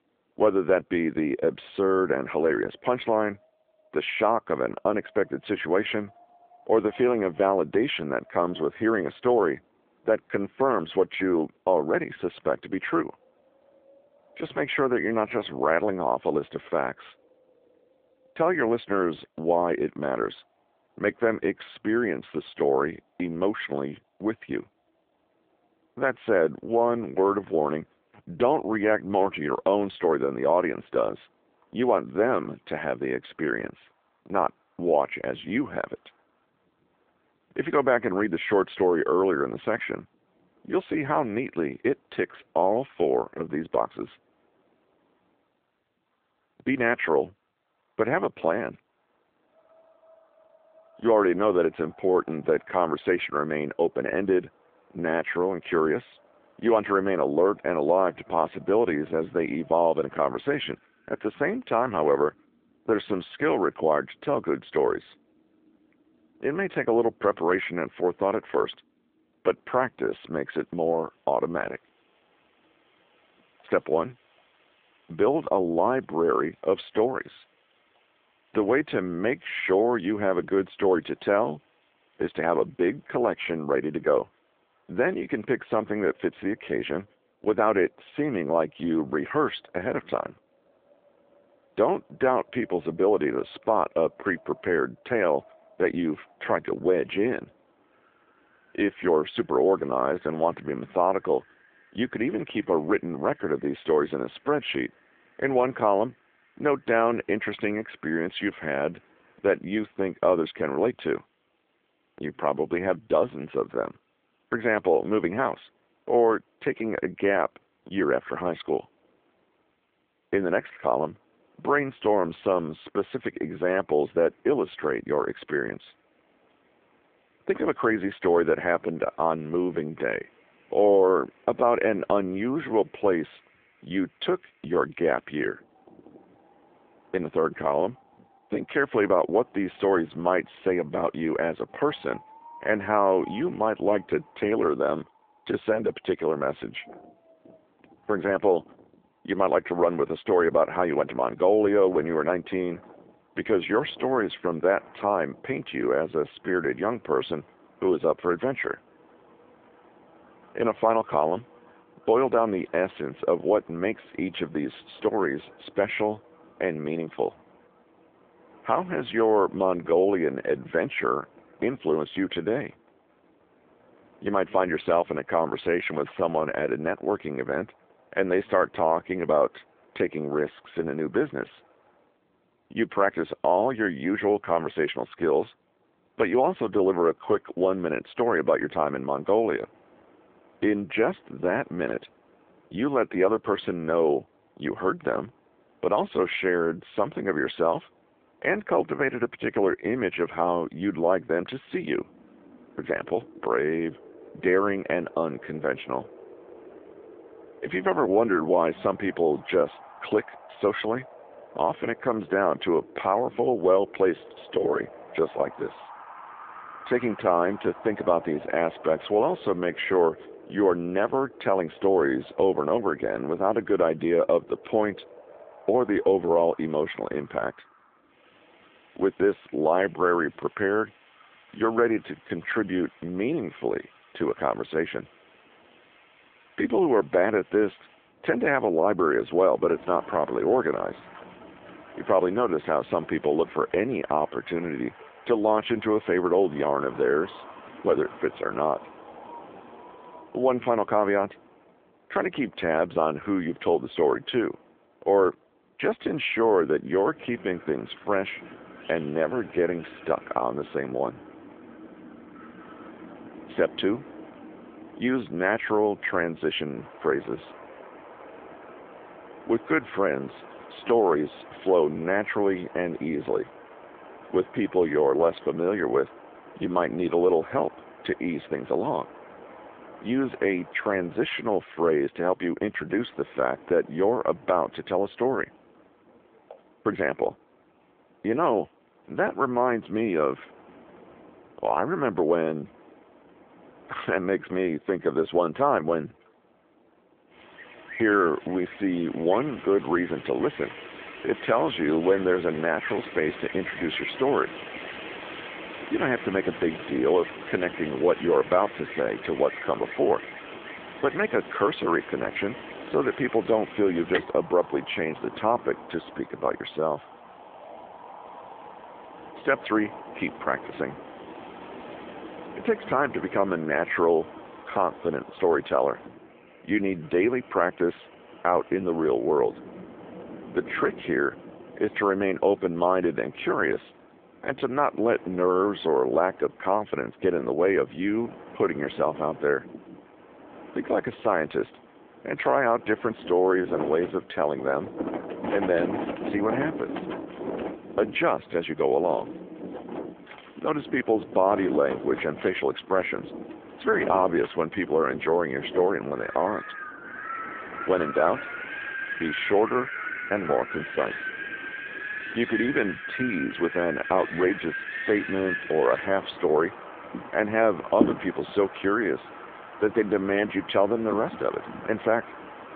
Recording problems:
phone-call audio
wind in the background; noticeable; throughout; 15 dB below the speech

